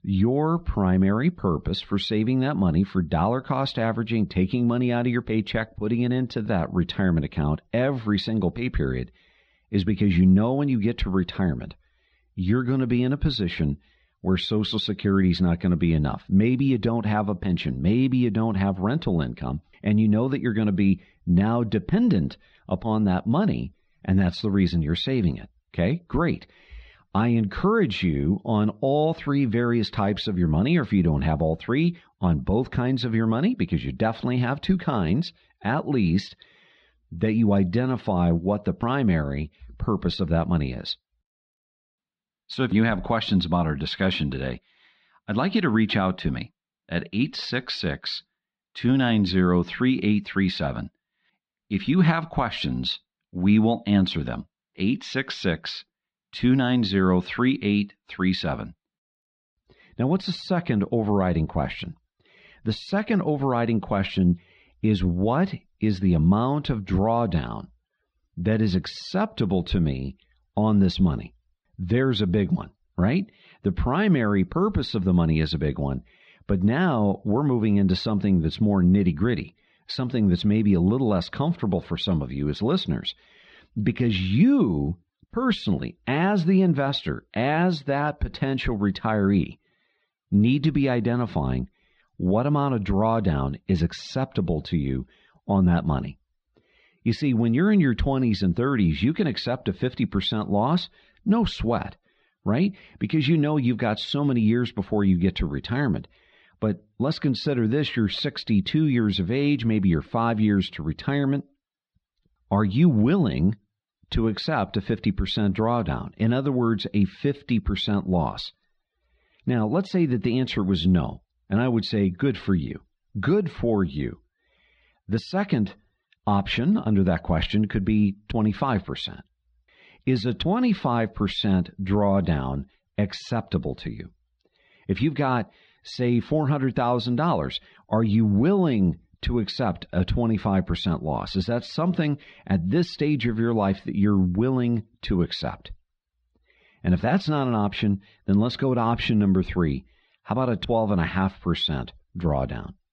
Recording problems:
muffled; slightly; fading above 4 kHz

